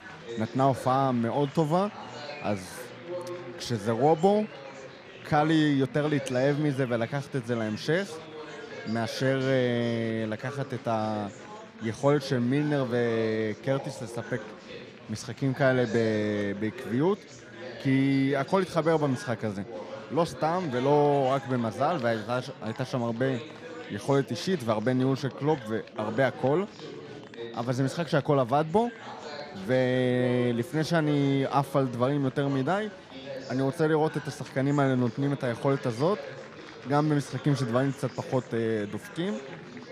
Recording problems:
chatter from many people; noticeable; throughout; 15 dB below the speech

